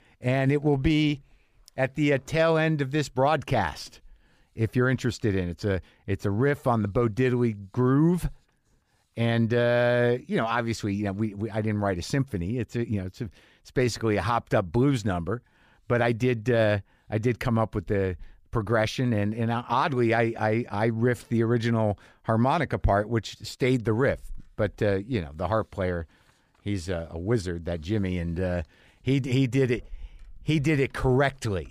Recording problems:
none

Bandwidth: 15 kHz